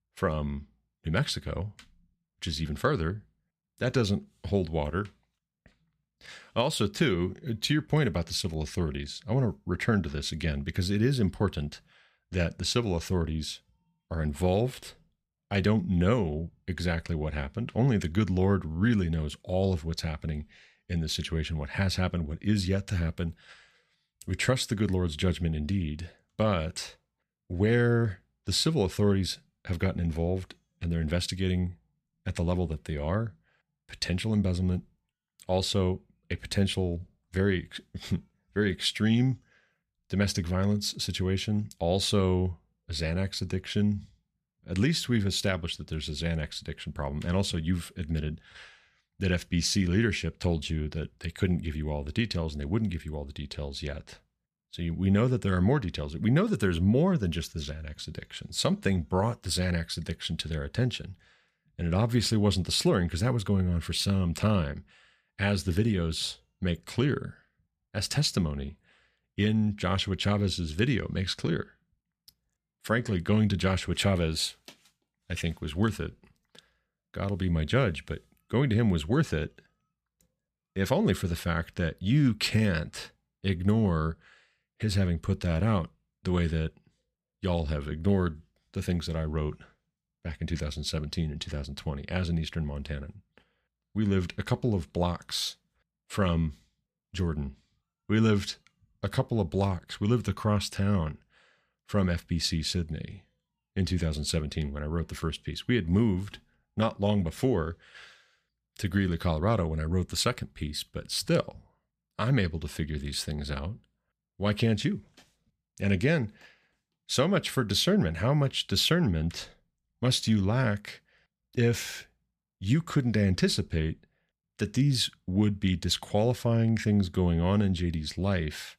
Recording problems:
none

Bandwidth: 14.5 kHz